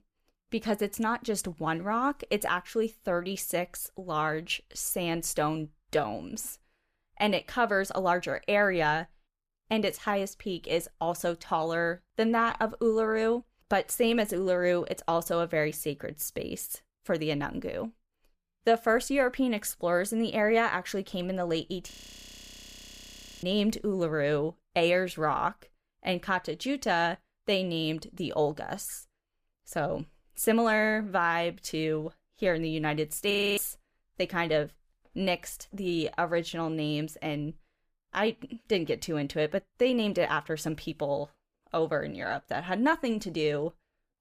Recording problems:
audio freezing; at 22 s for 1.5 s and at 33 s

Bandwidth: 15 kHz